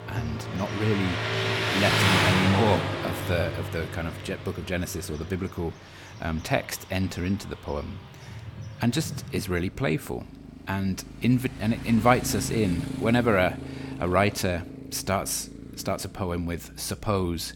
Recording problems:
traffic noise; loud; throughout; 2 dB below the speech

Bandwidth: 17.5 kHz